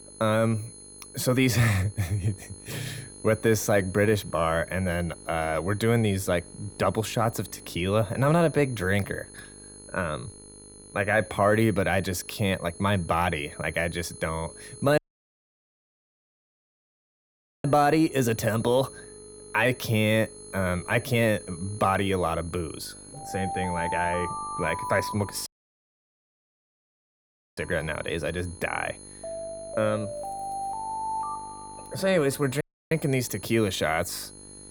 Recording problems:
high-pitched whine; noticeable; throughout; 10 kHz, 20 dB below the speech
alarms or sirens; noticeable; throughout; 10 dB below the speech
electrical hum; faint; throughout; 50 Hz, 30 dB below the speech
audio cutting out; at 15 s for 2.5 s, at 25 s for 2 s and at 33 s

